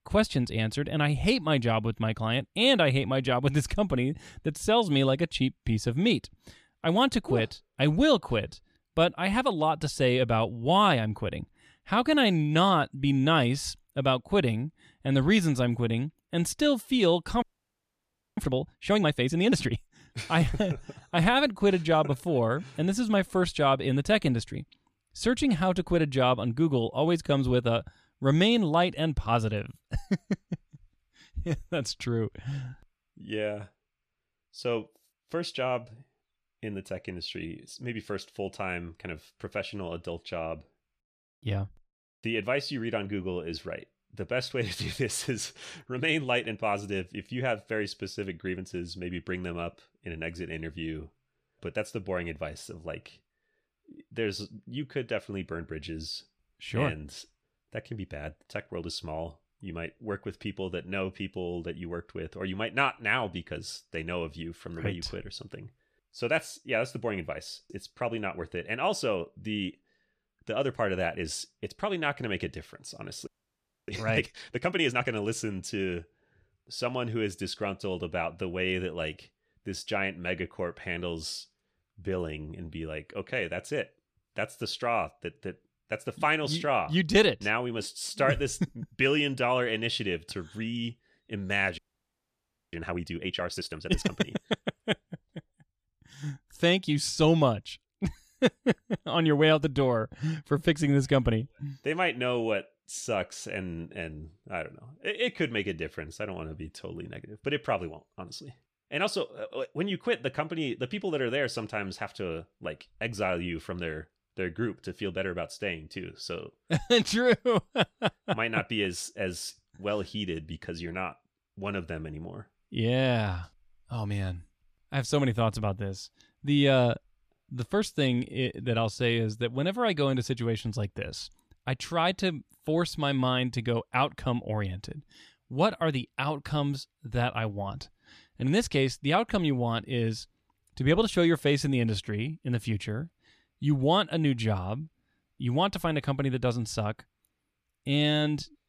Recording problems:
audio freezing; at 17 s for 1 s, at 1:13 for 0.5 s and at 1:32 for 1 s

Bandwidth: 14.5 kHz